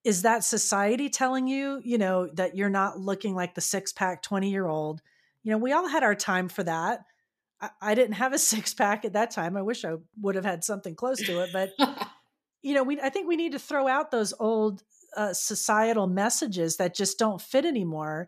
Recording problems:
none

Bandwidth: 14.5 kHz